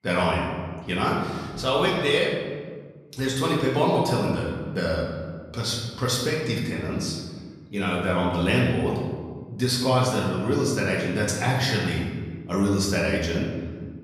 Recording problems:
off-mic speech; far
room echo; noticeable; dies away in 1.5 s

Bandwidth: 14.5 kHz